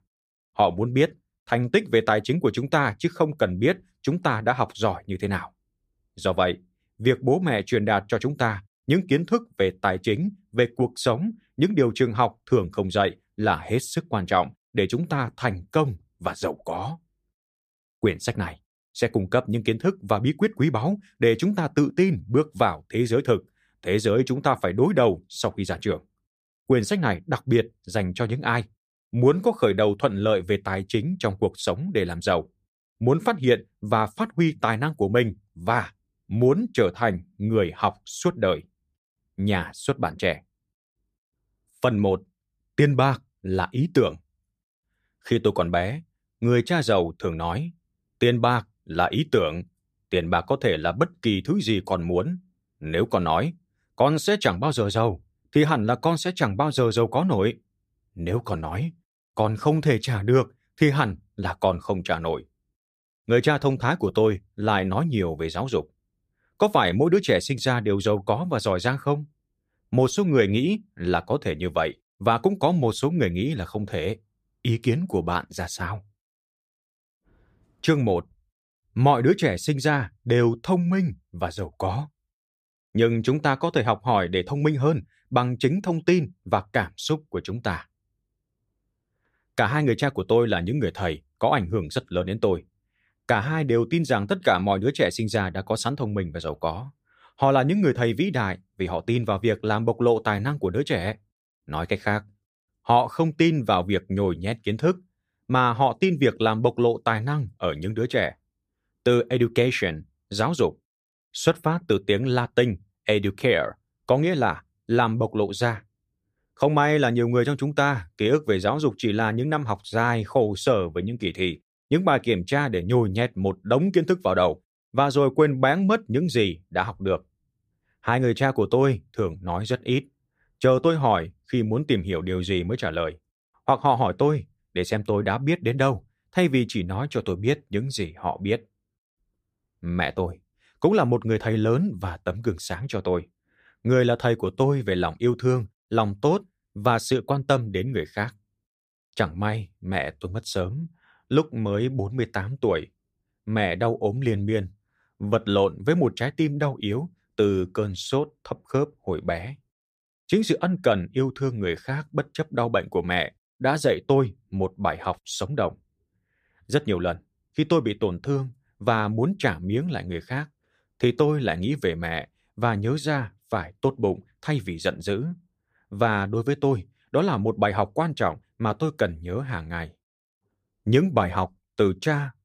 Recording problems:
none

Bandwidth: 15 kHz